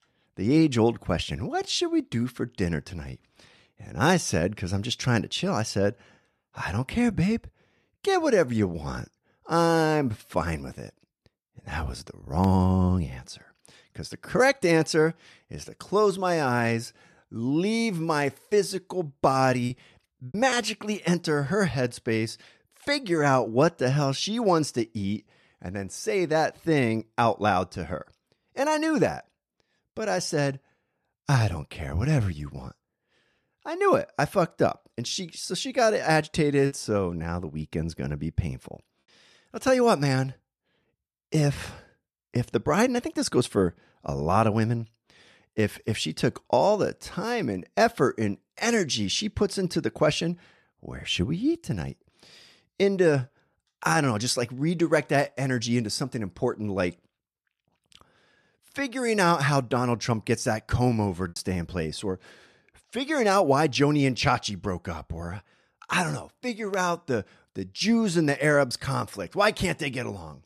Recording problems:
choppy; occasionally; at 20 s, at 37 s and at 1:01; 4% of the speech affected

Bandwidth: 13.5 kHz